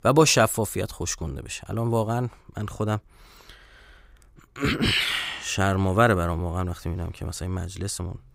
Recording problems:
none

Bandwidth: 15.5 kHz